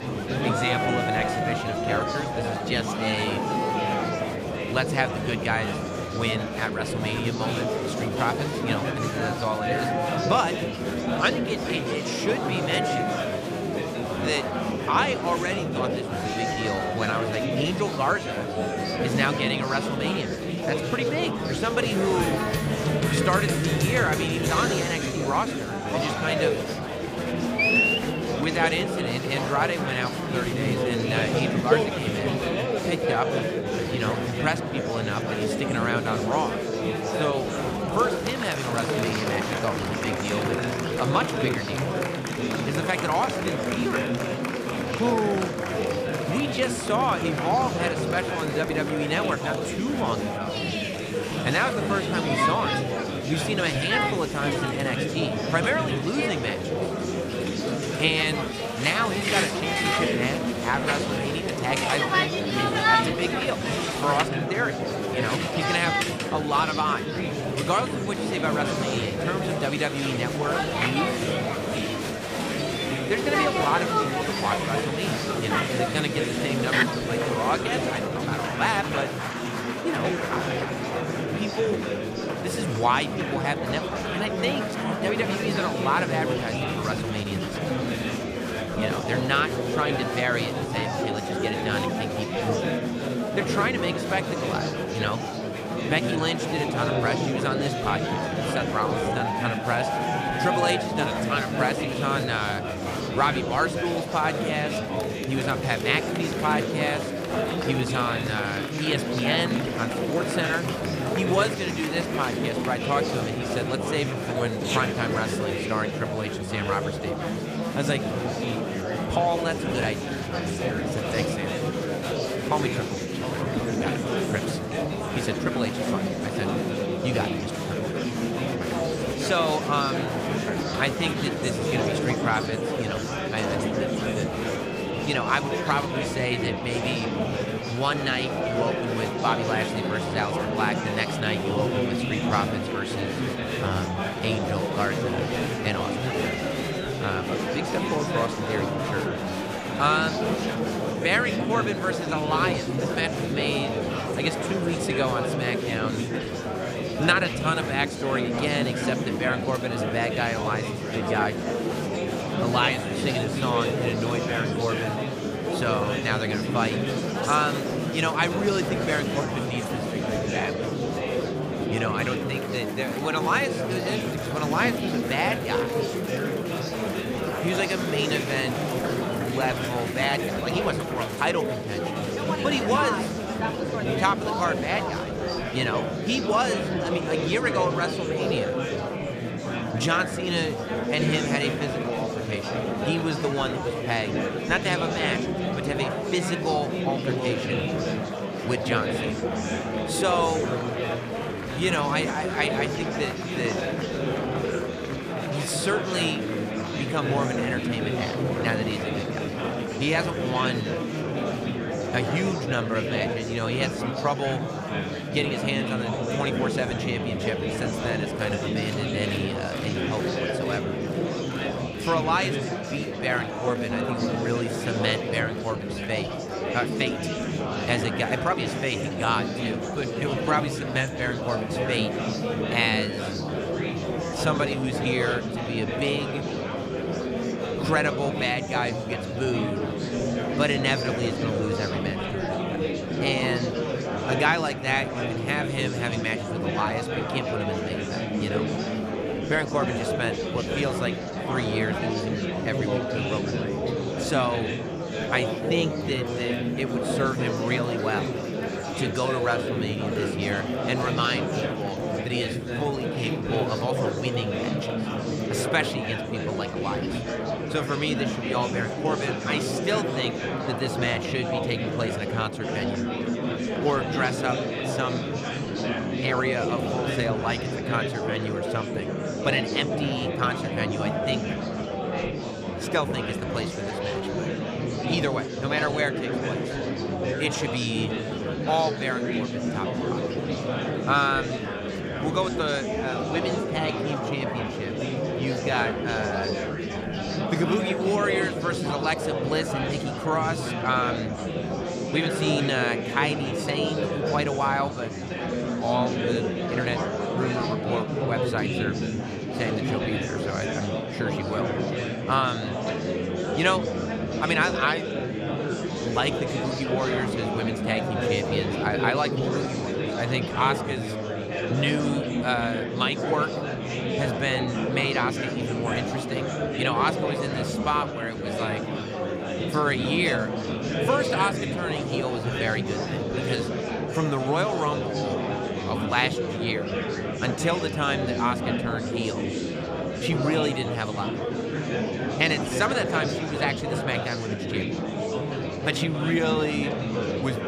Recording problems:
murmuring crowd; very loud; throughout; 1 dB above the speech

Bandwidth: 15 kHz